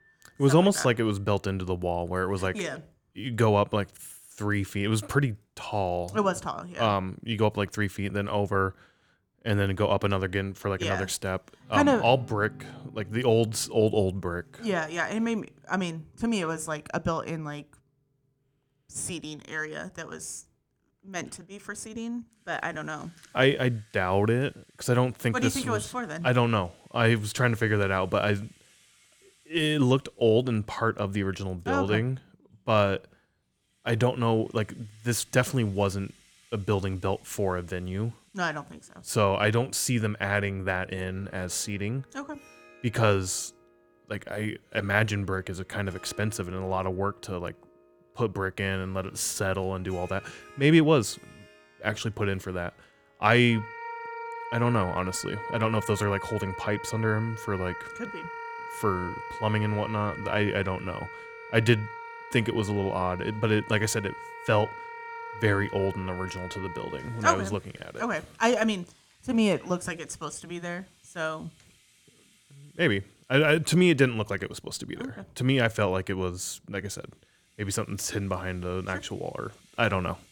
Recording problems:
background music; noticeable; throughout; 15 dB below the speech

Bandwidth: 19 kHz